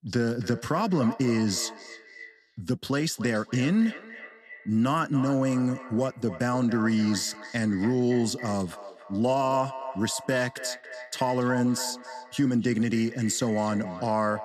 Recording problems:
echo of what is said; noticeable; throughout; 280 ms later, 15 dB below the speech

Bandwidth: 13.5 kHz